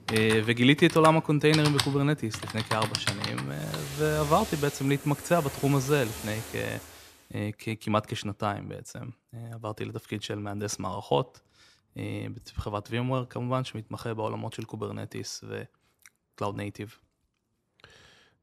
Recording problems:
household noises; loud; until 6.5 s; 6 dB below the speech

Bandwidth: 14.5 kHz